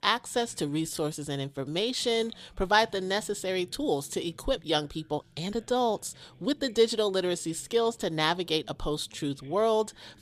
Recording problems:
voice in the background; faint; throughout; 30 dB below the speech
uneven, jittery; strongly; from 1 to 9.5 s

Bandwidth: 14.5 kHz